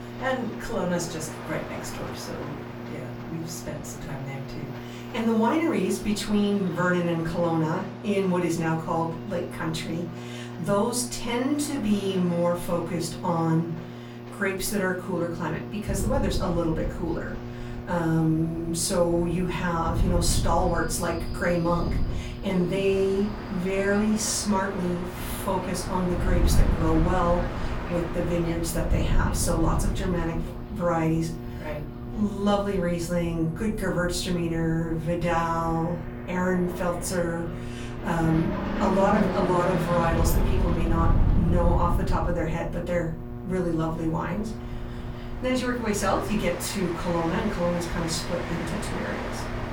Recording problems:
off-mic speech; far
room echo; slight; dies away in 0.3 s
electrical hum; noticeable; throughout; 60 Hz, 15 dB below the speech
train or aircraft noise; noticeable; throughout; 10 dB below the speech
wind noise on the microphone; occasional gusts; from 16 s on; 15 dB below the speech

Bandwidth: 17.5 kHz